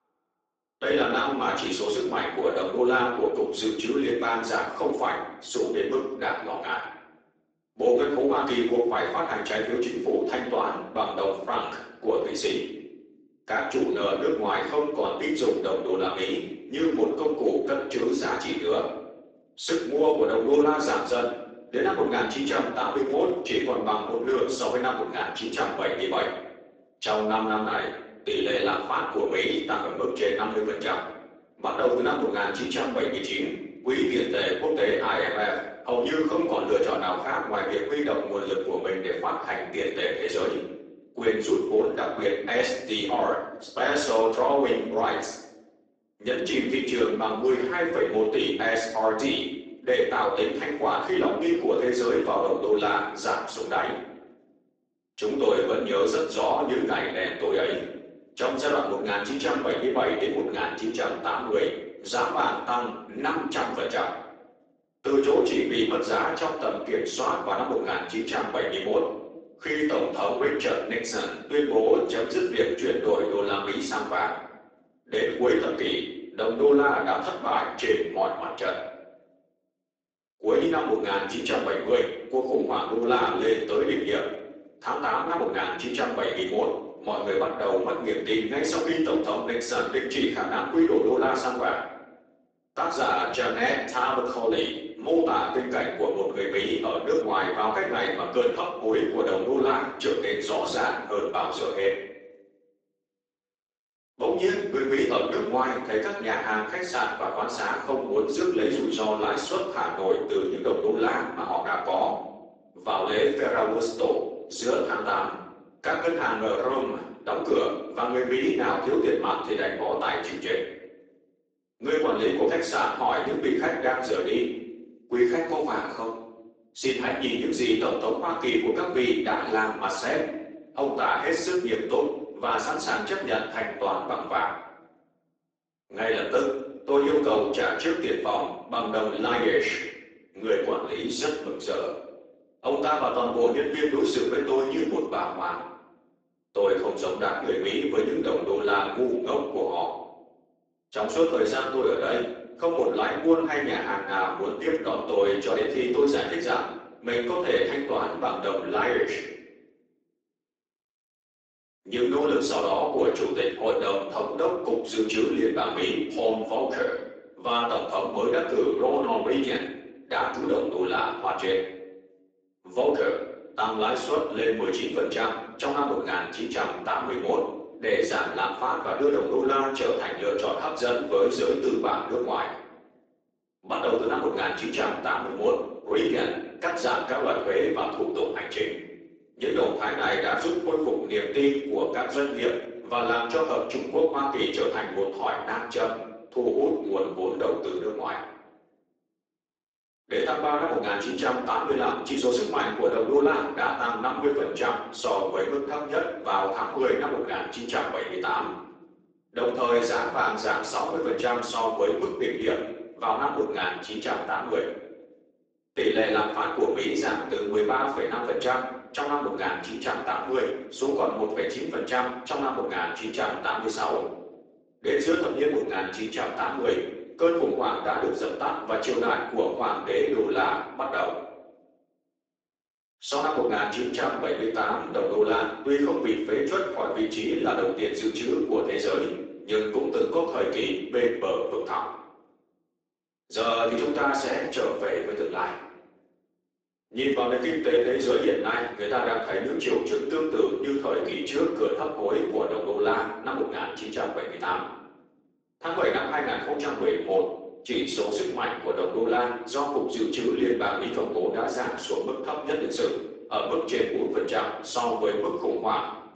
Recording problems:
off-mic speech; far
garbled, watery; badly; nothing above 7.5 kHz
room echo; noticeable; dies away in 0.9 s
thin; somewhat; fading below 250 Hz

